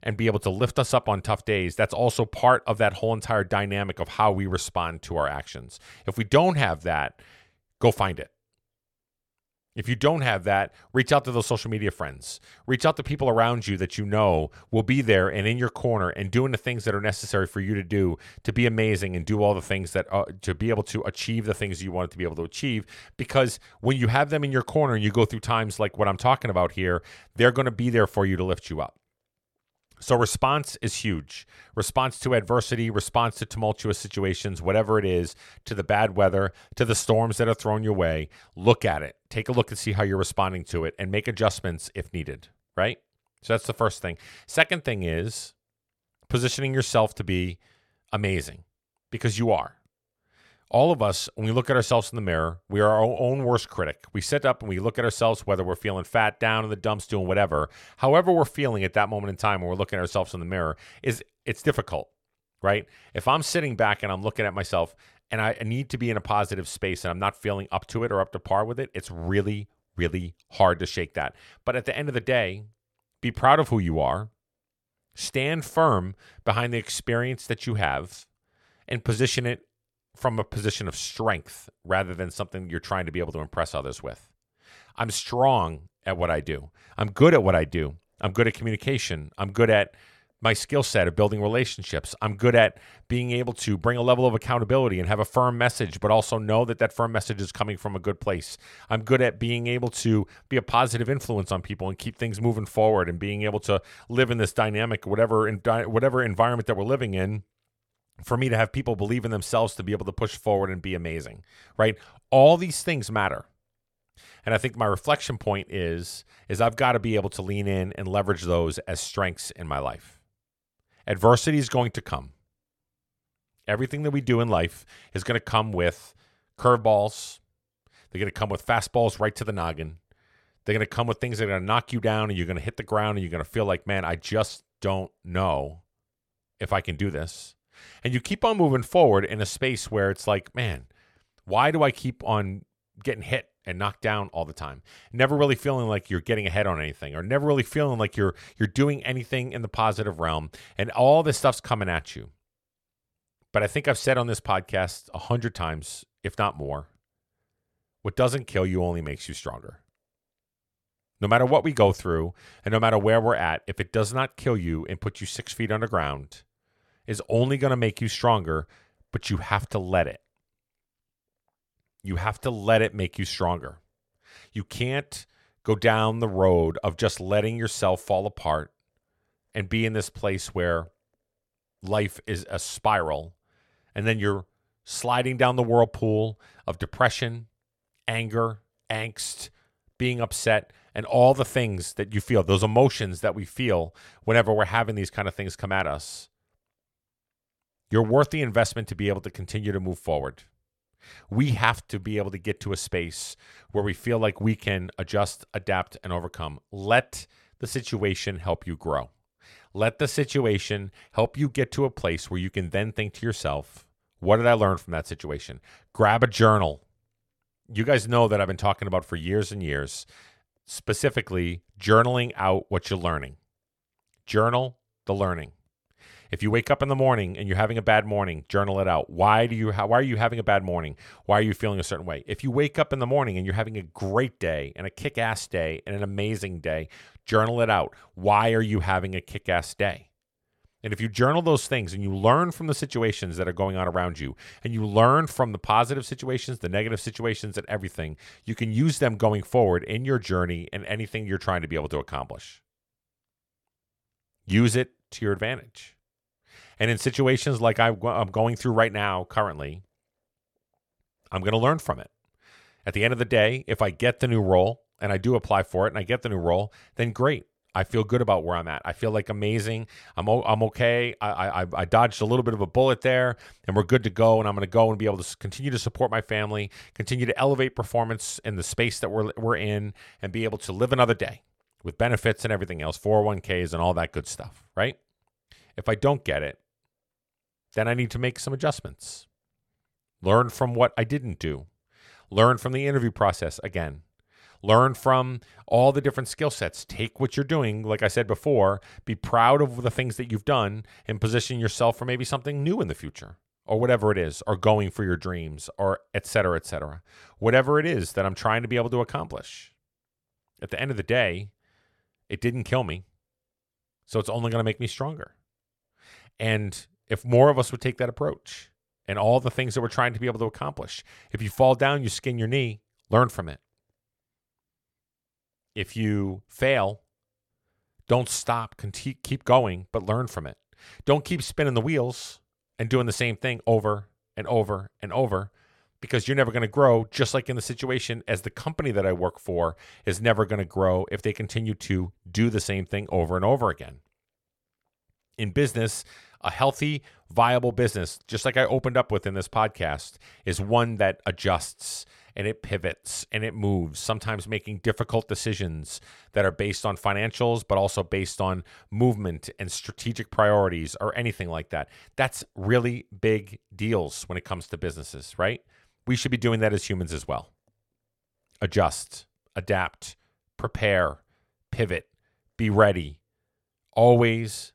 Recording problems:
none

